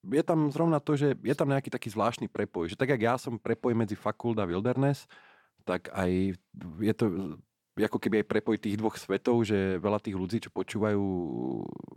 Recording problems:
none

